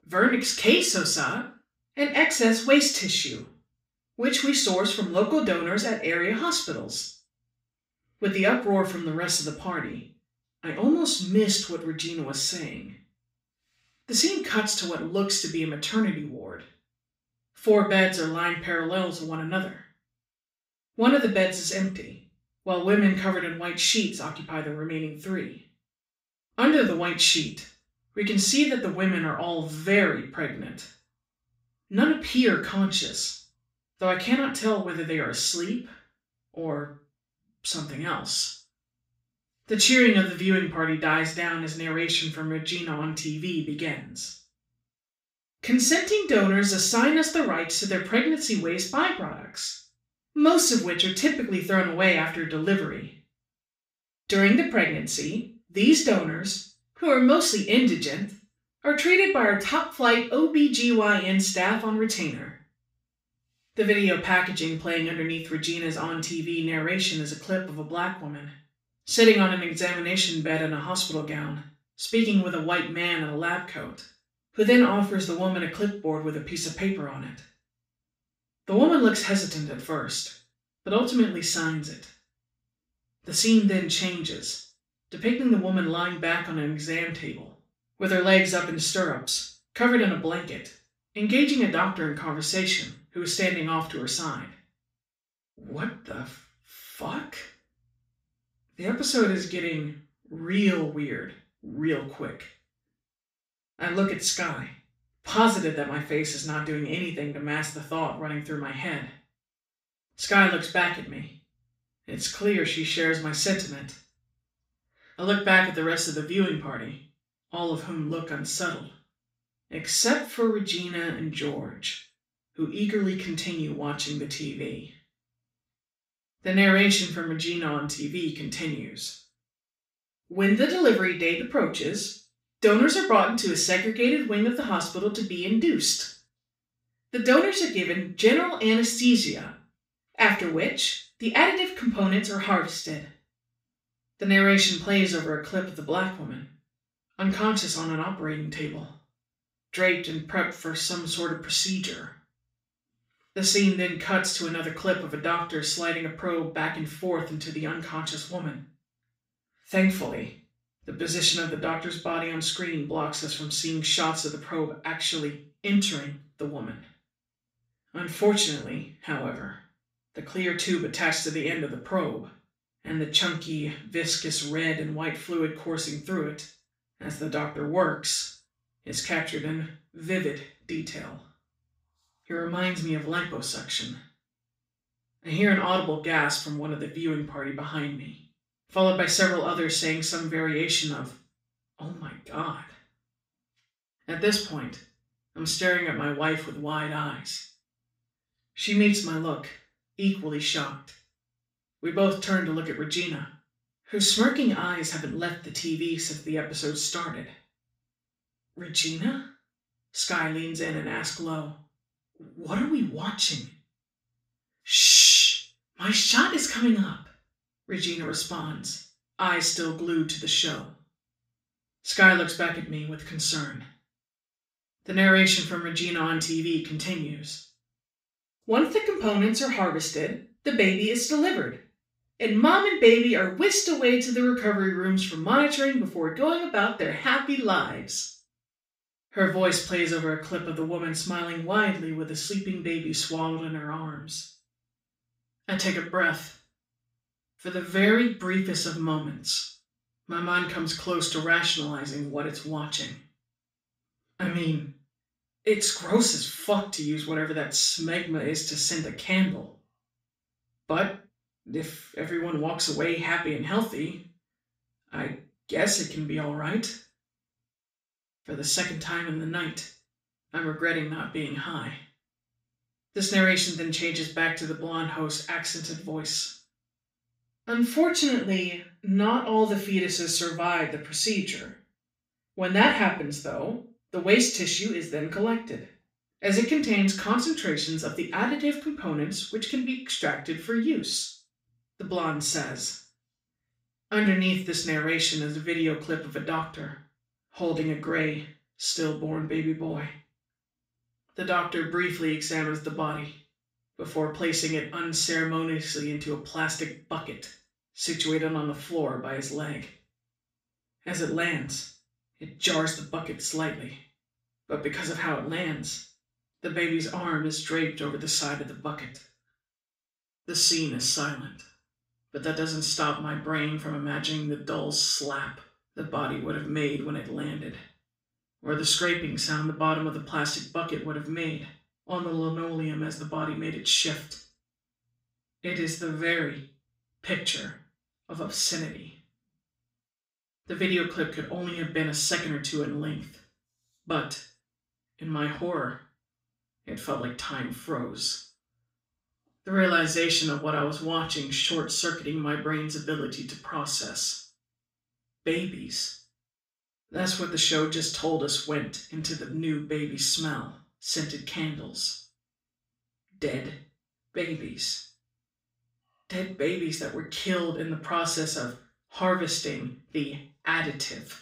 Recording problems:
off-mic speech; far
room echo; noticeable; dies away in 0.4 s

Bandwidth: 15.5 kHz